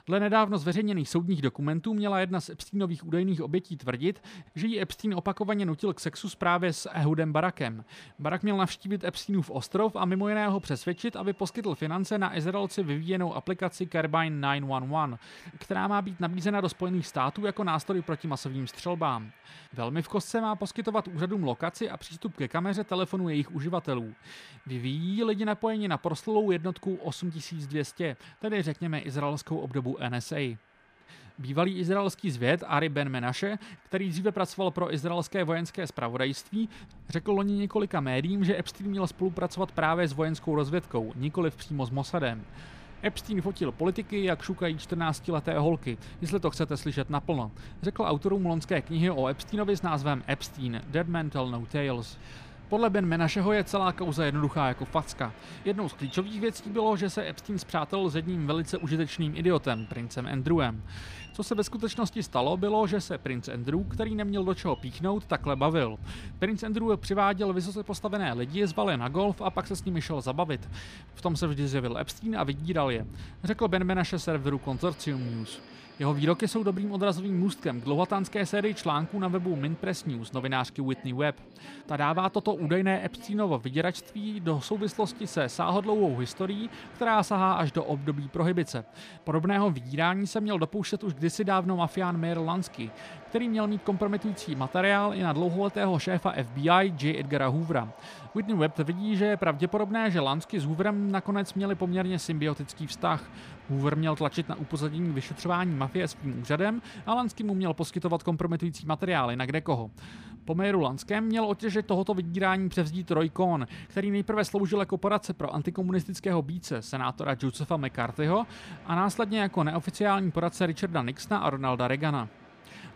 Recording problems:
train or aircraft noise; faint; throughout; 20 dB below the speech

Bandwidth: 15 kHz